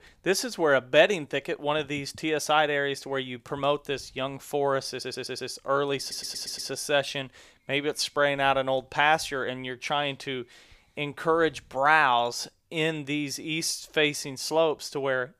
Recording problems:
audio stuttering; at 5 s and at 6 s

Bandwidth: 15 kHz